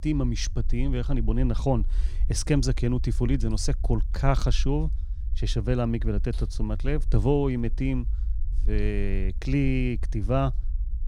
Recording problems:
low rumble; faint; throughout; 20 dB below the speech

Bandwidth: 16 kHz